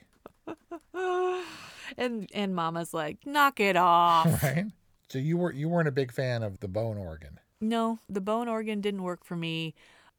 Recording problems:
none

